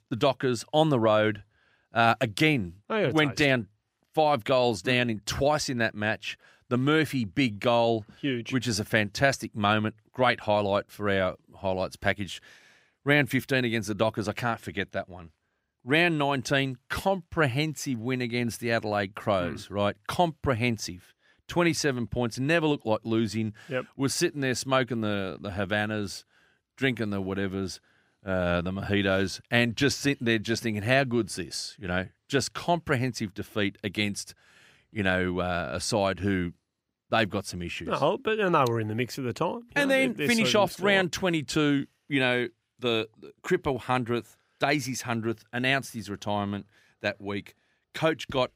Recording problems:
none

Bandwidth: 15.5 kHz